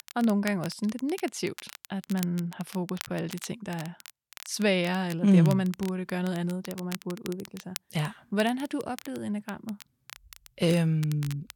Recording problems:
crackle, like an old record; noticeable; 15 dB below the speech

